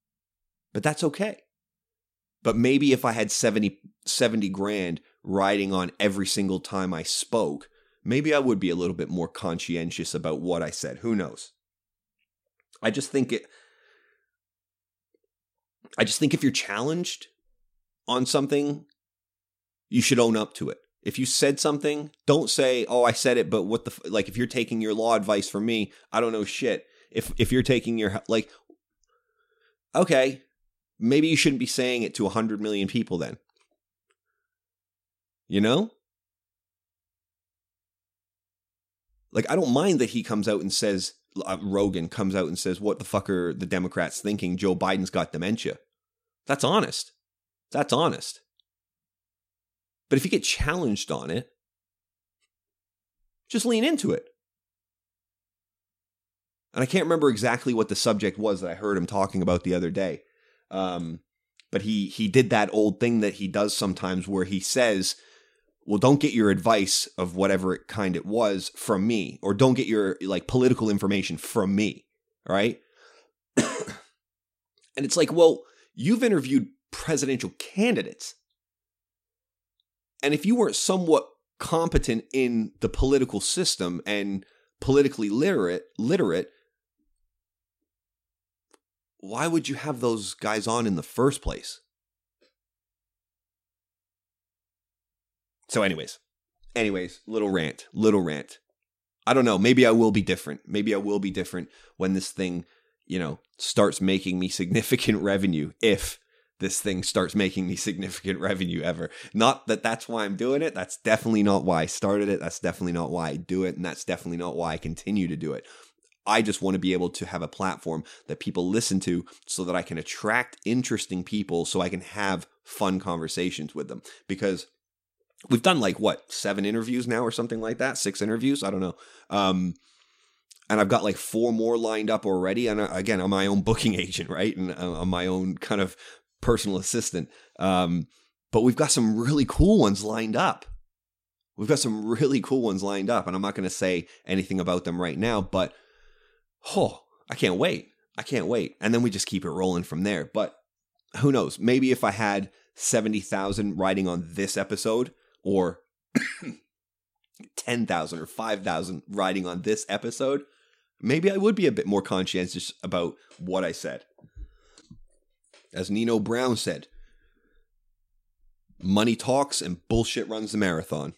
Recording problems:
none

